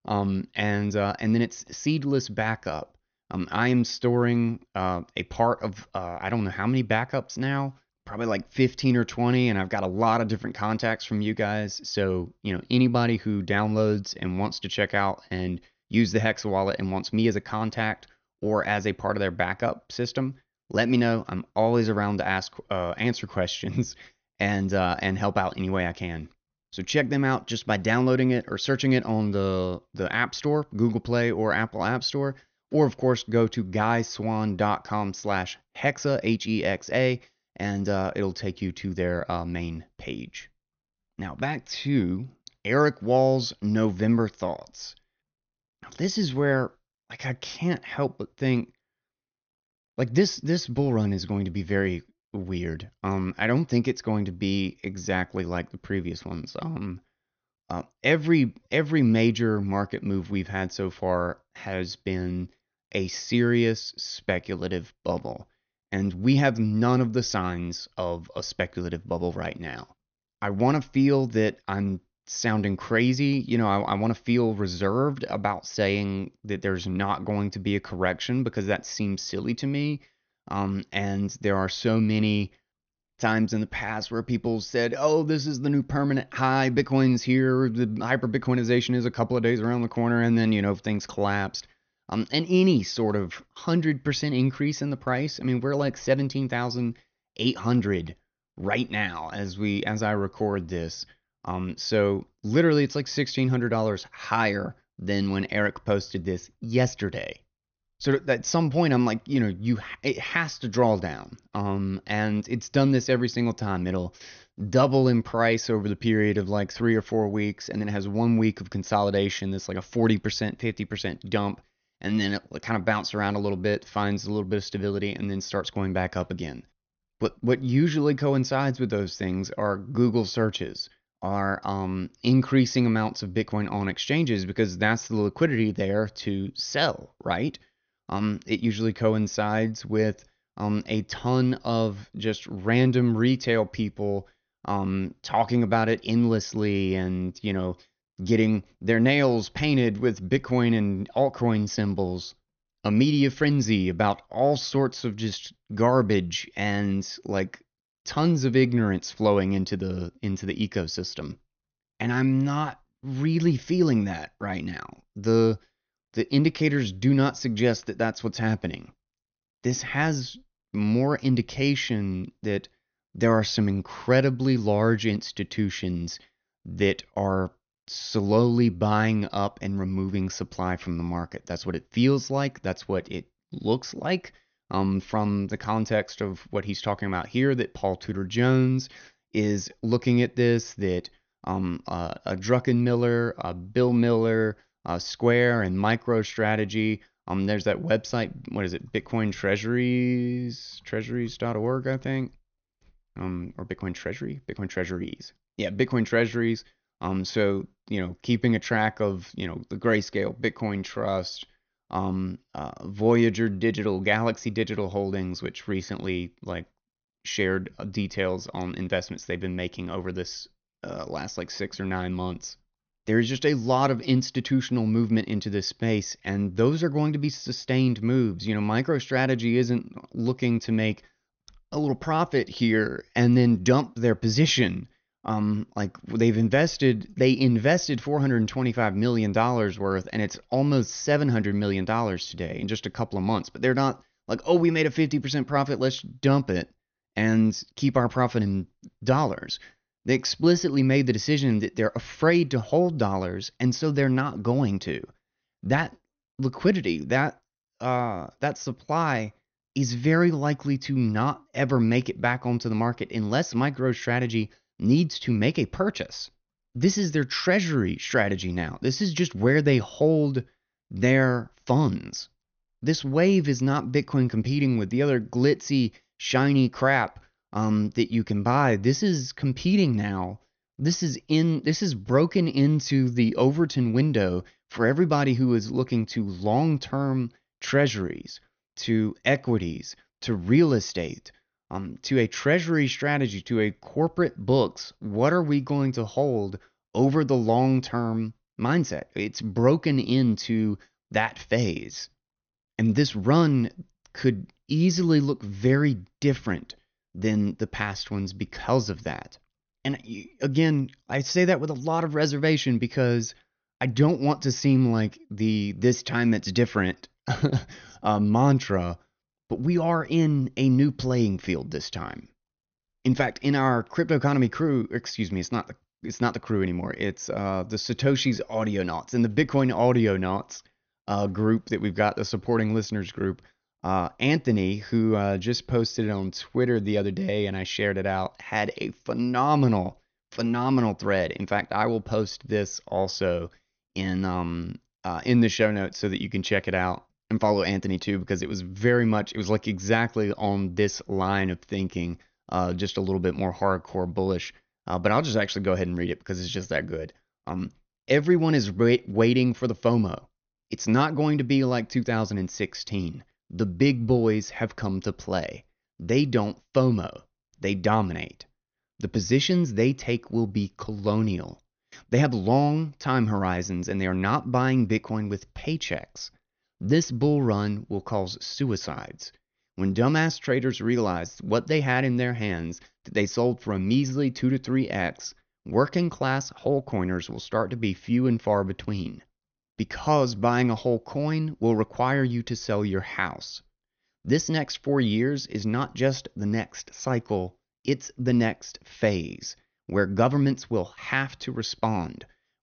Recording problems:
high frequencies cut off; noticeable; nothing above 6.5 kHz

